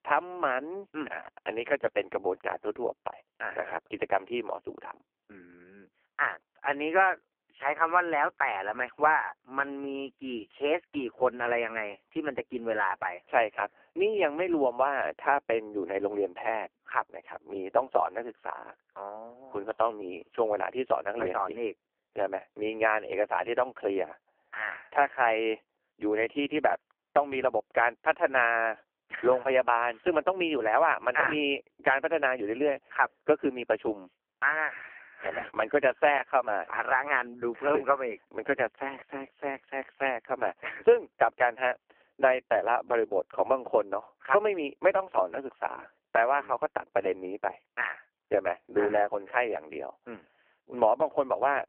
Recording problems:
phone-call audio; poor line; nothing above 3 kHz

